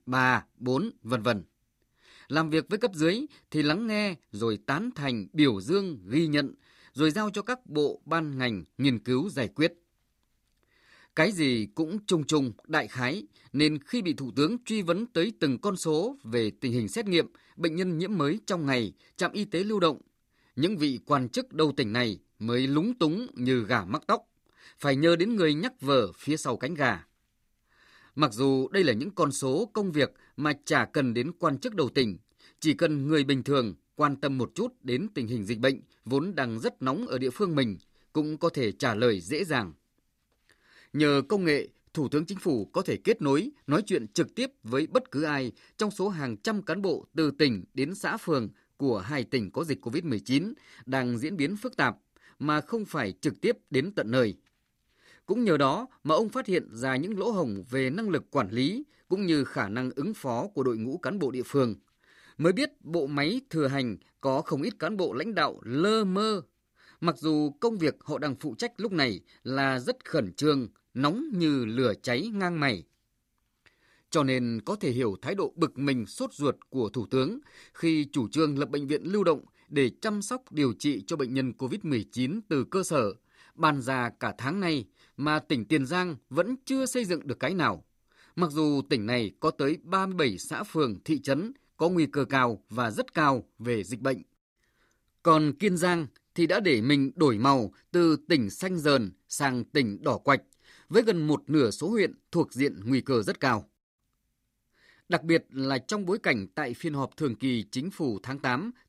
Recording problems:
none

